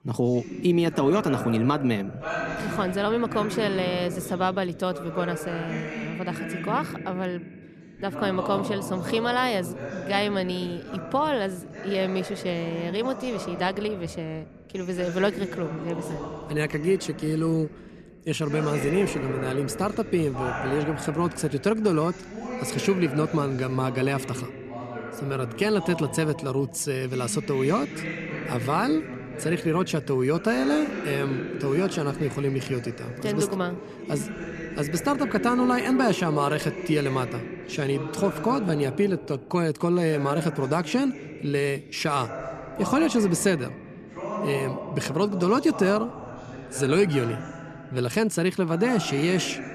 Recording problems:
voice in the background; loud; throughout; 9 dB below the speech

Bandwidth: 14 kHz